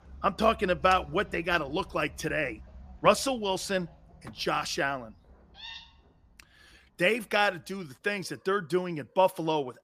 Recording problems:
animal sounds; faint; throughout; 20 dB below the speech

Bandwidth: 15 kHz